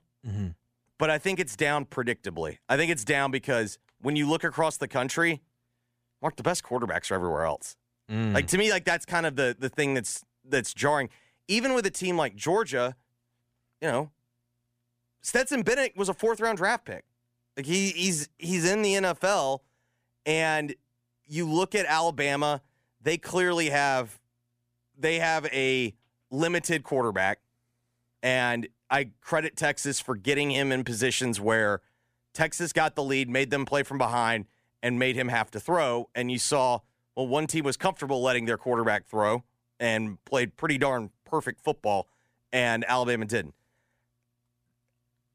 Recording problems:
none

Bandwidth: 15 kHz